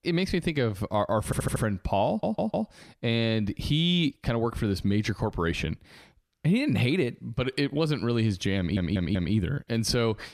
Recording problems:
audio stuttering; at 1.5 s, at 2 s and at 8.5 s

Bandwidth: 14.5 kHz